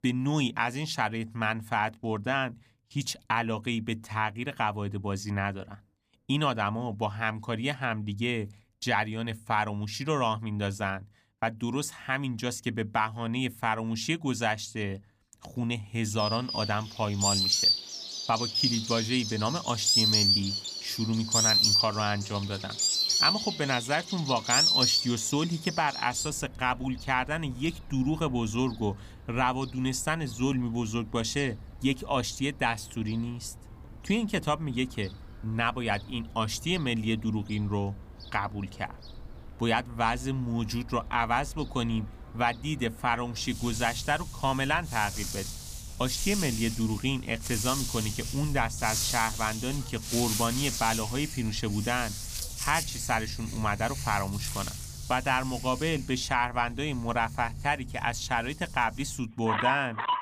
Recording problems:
animal sounds; very loud; from 16 s on; 1 dB above the speech

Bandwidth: 15 kHz